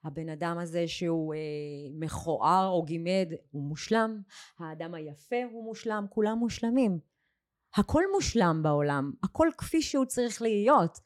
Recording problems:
none

